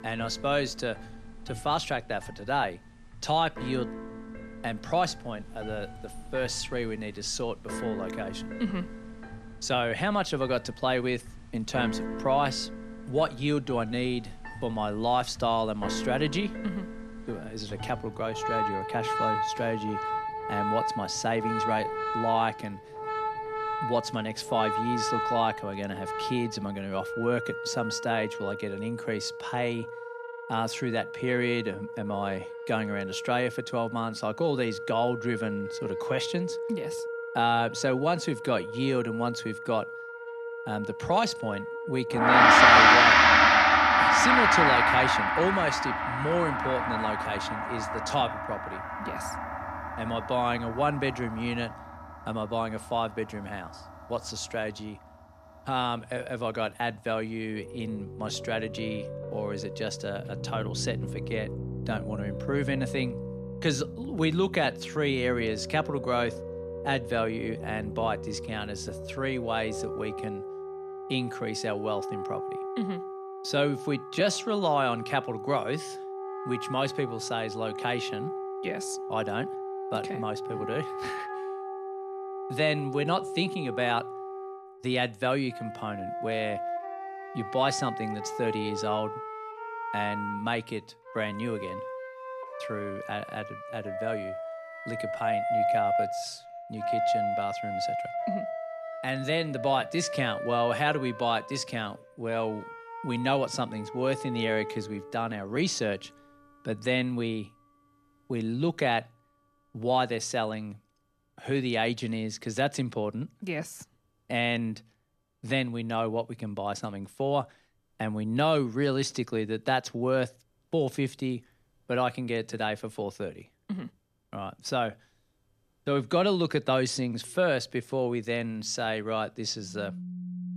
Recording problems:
background music; very loud; throughout; 1 dB above the speech

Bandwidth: 14 kHz